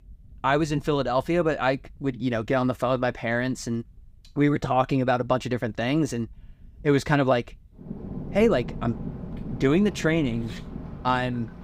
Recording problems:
rain or running water; noticeable; throughout; 15 dB below the speech

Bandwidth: 15.5 kHz